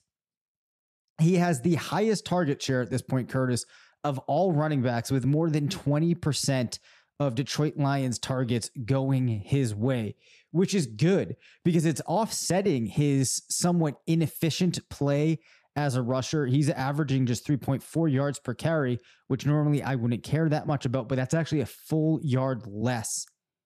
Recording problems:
none

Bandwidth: 14 kHz